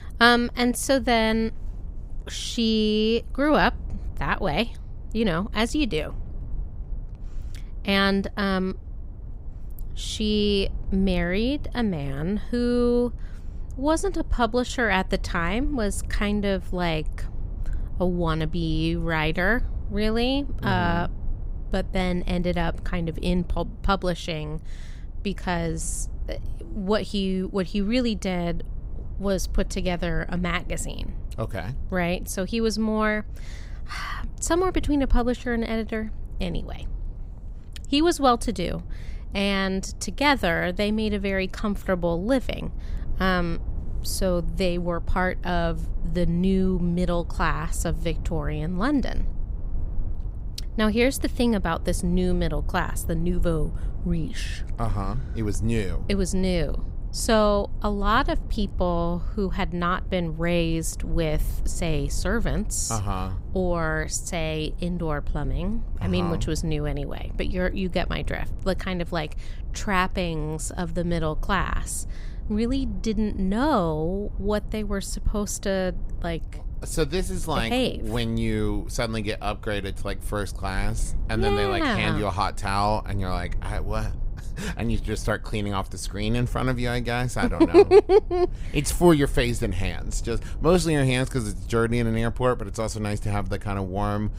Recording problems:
low rumble; faint; throughout; 25 dB below the speech

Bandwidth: 15.5 kHz